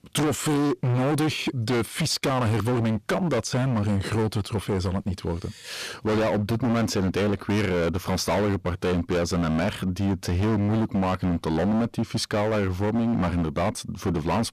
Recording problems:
distortion; heavy; 28% of the sound clipped

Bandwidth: 14.5 kHz